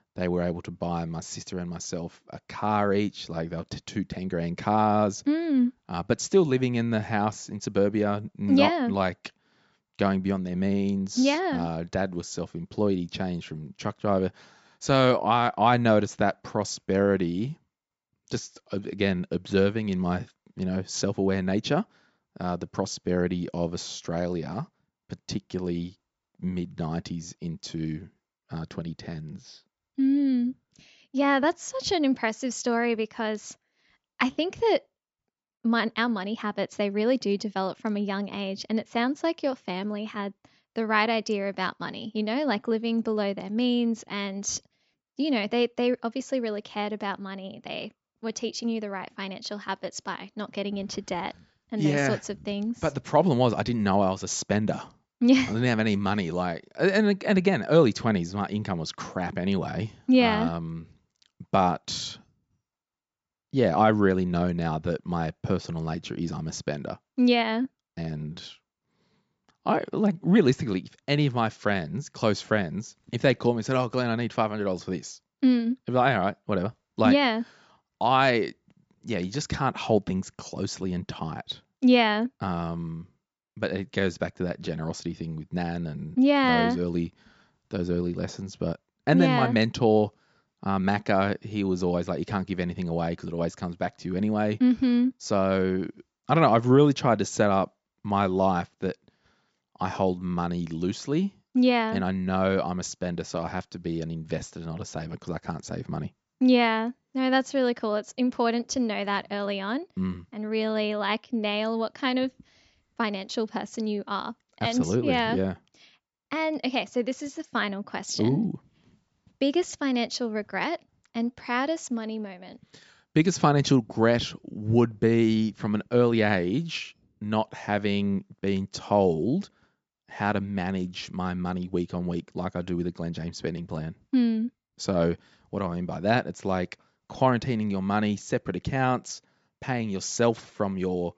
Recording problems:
high frequencies cut off; noticeable; nothing above 8 kHz

